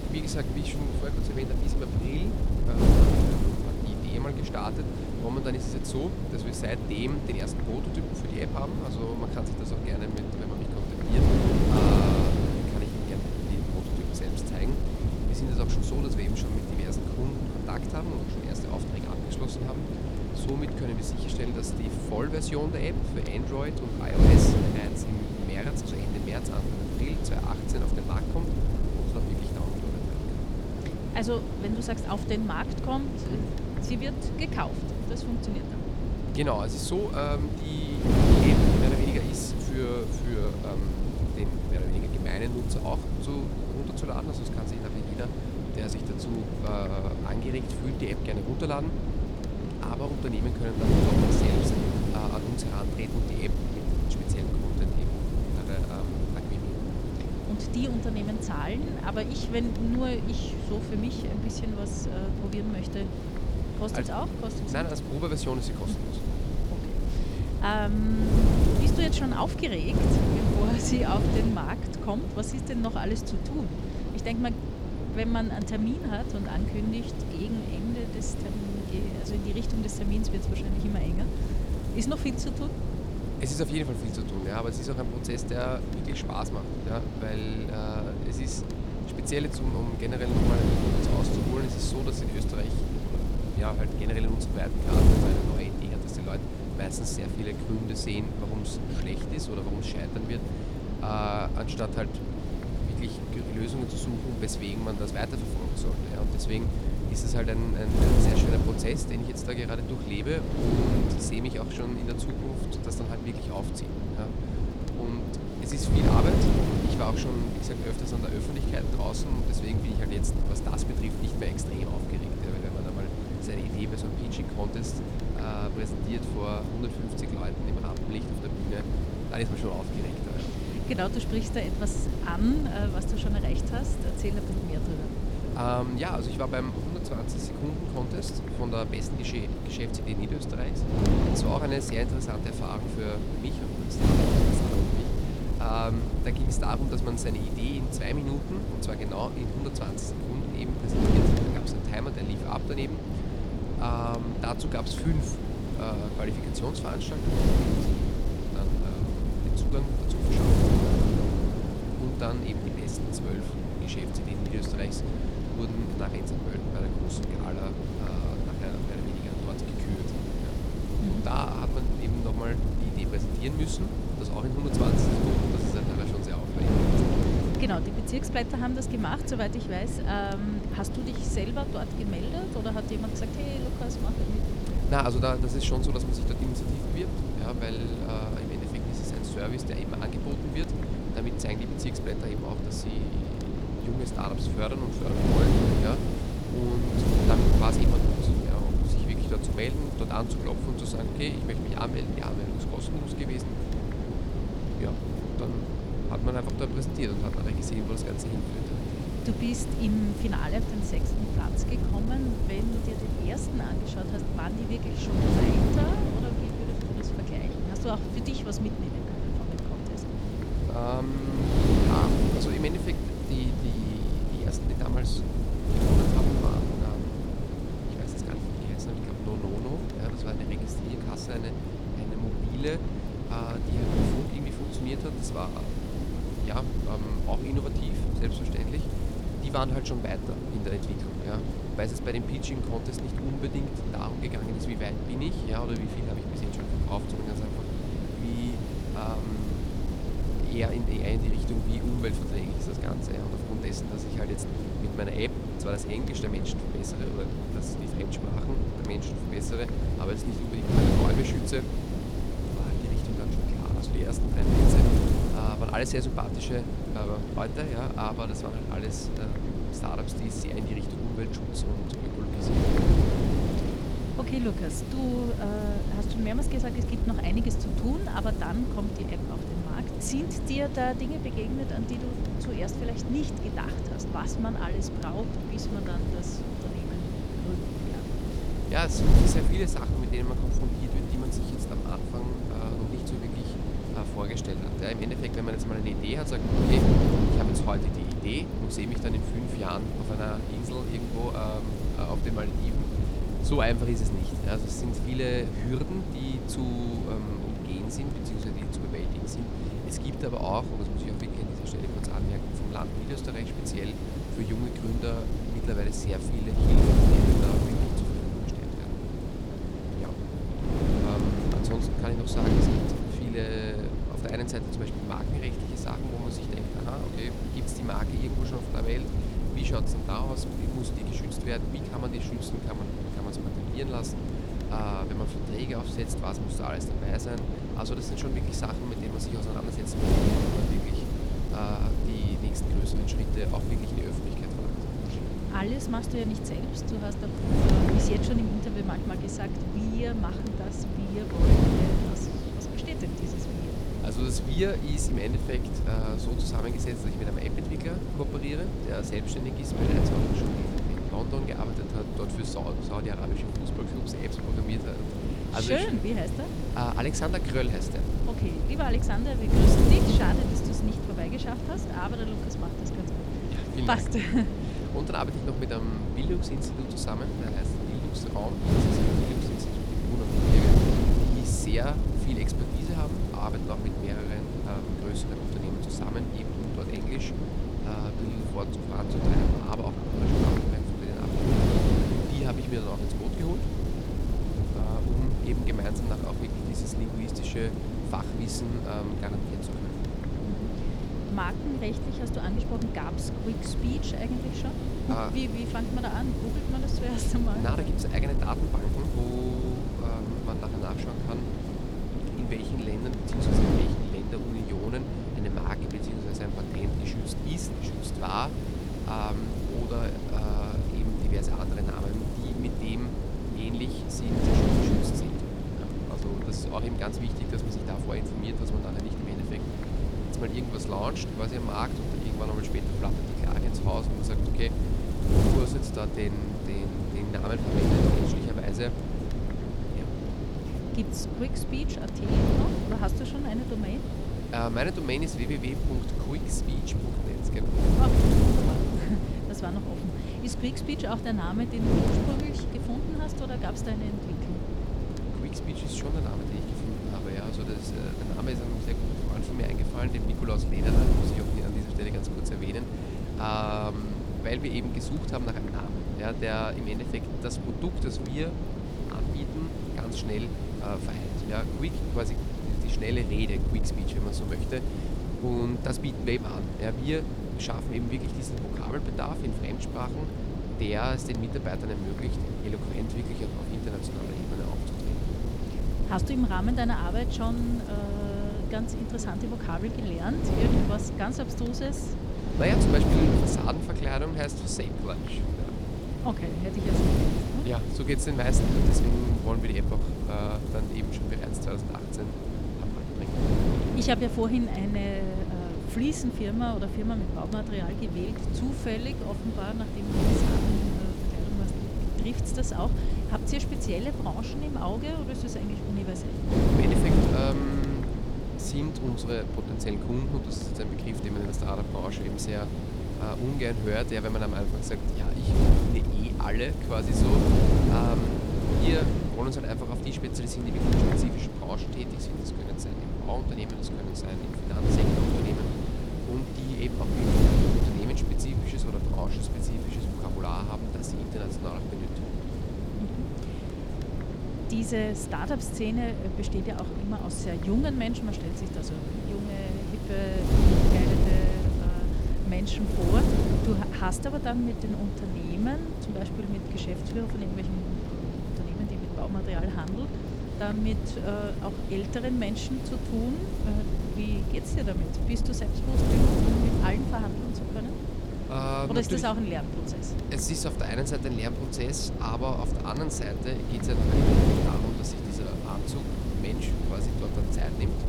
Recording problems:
wind noise on the microphone; heavy; as loud as the speech

